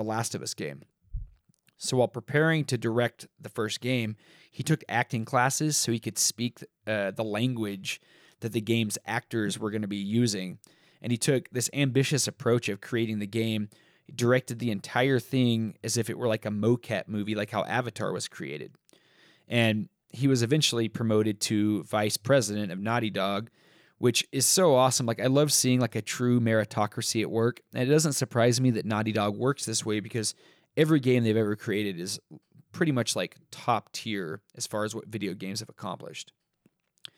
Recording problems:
abrupt cut into speech; at the start

